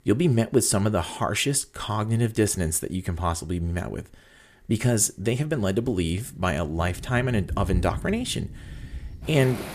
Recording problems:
rain or running water; noticeable; from 5.5 s on; 10 dB below the speech

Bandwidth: 14.5 kHz